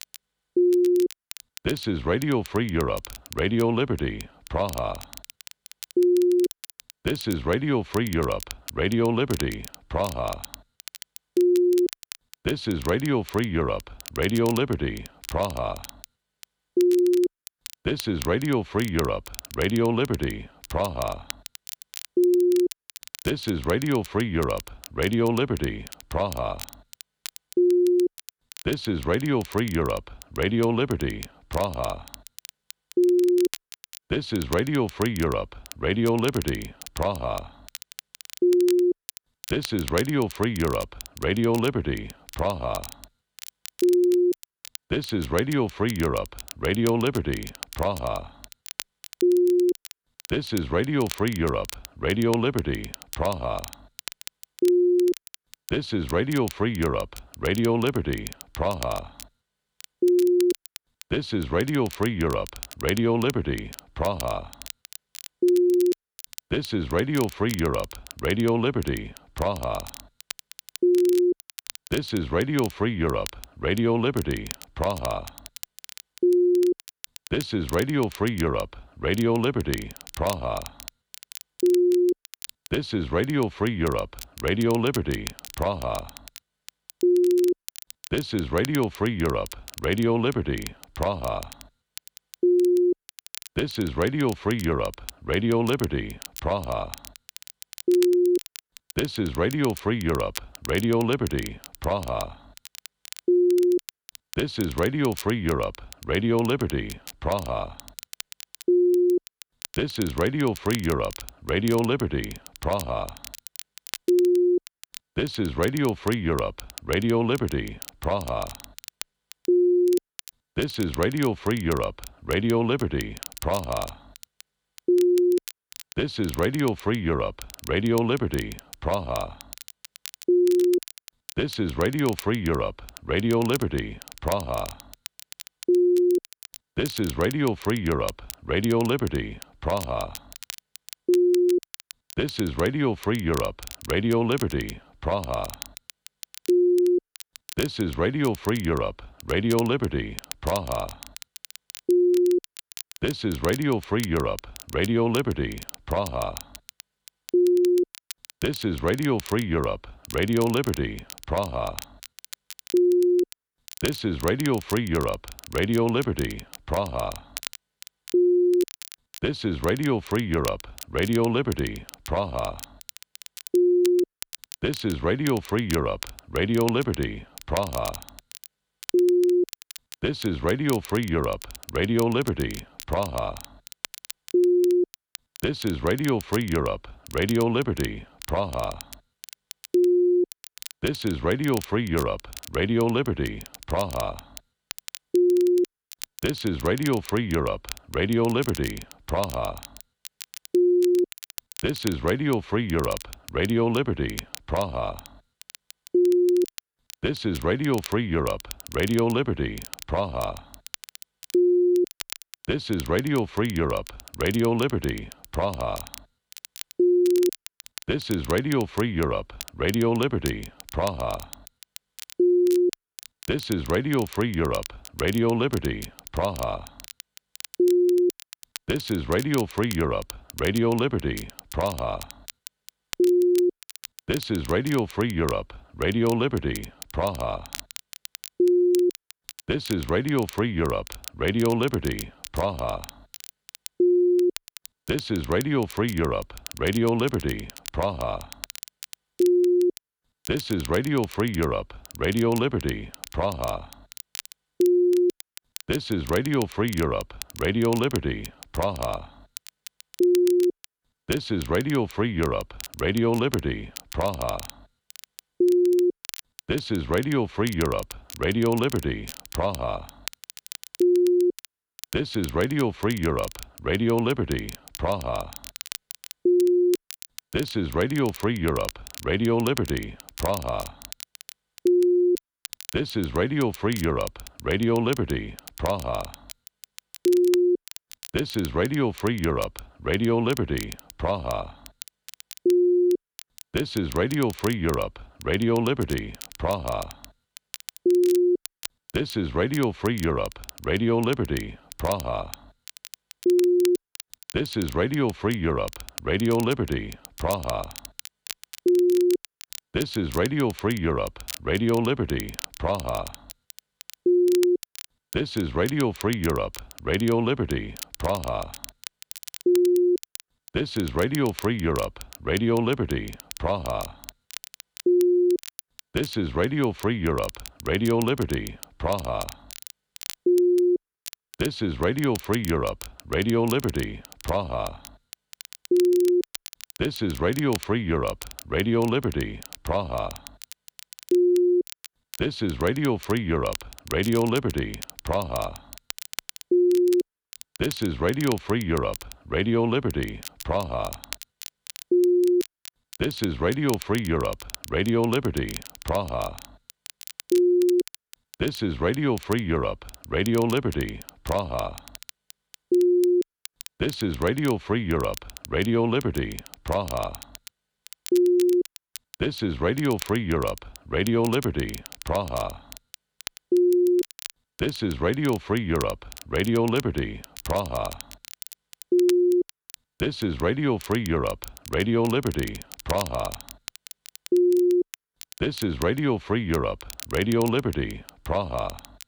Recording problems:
crackle, like an old record; noticeable; 15 dB below the speech

